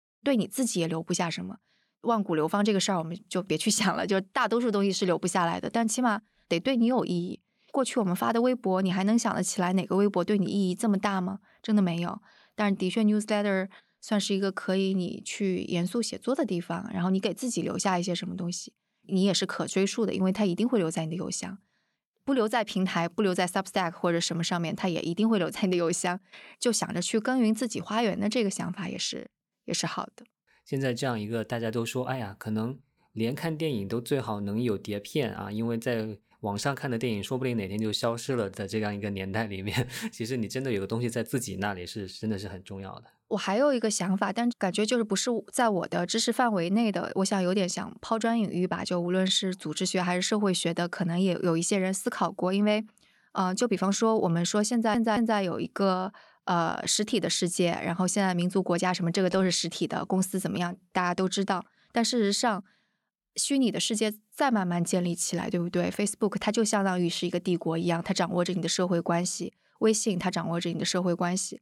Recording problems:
audio stuttering; at 55 s

